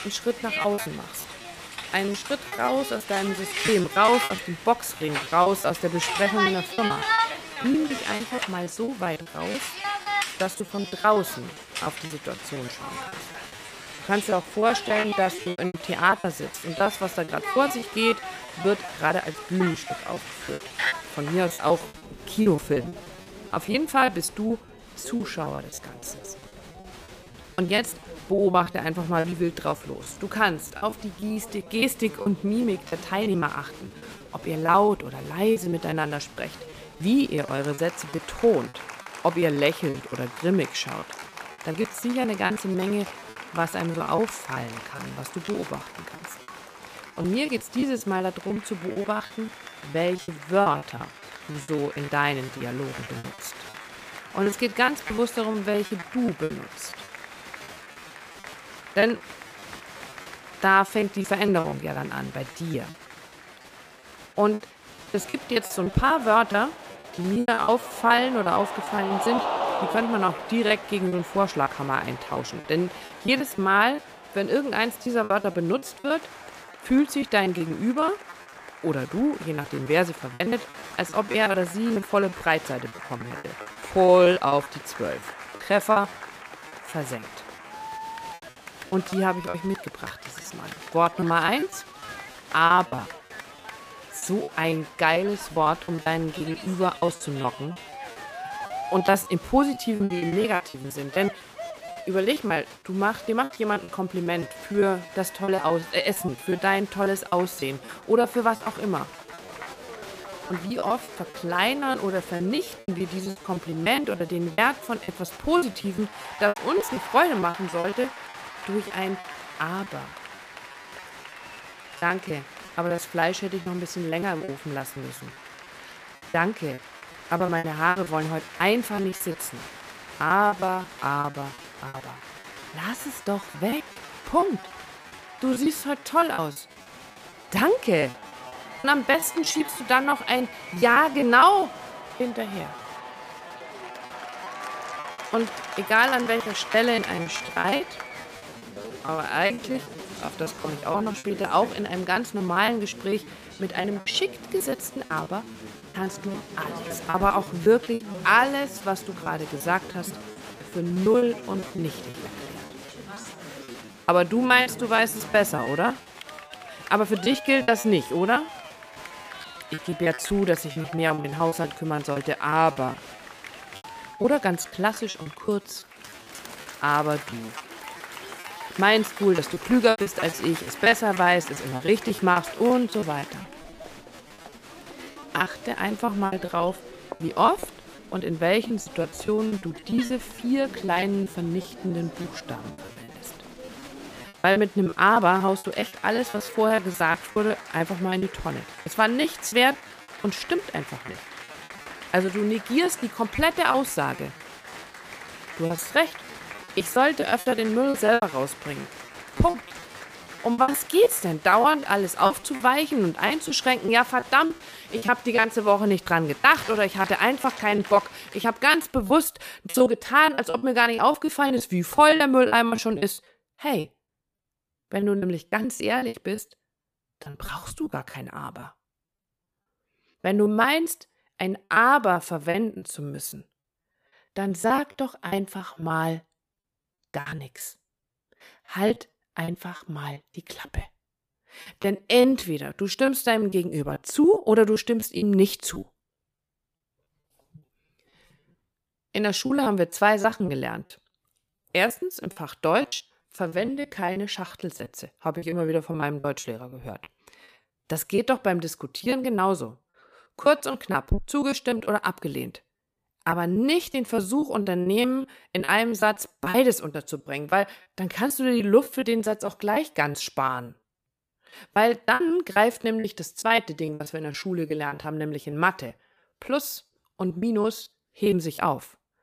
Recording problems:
crowd noise; noticeable; until 3:38; 15 dB below the speech
choppy; very; 14% of the speech affected

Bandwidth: 15 kHz